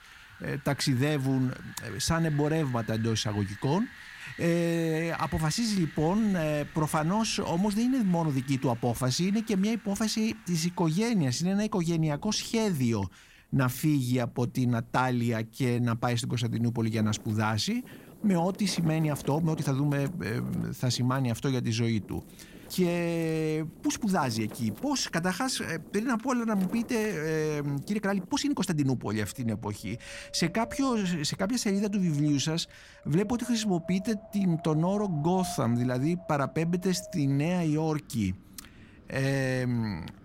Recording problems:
wind in the background; noticeable; throughout; 20 dB below the speech
uneven, jittery; strongly; from 10 to 30 s

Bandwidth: 16 kHz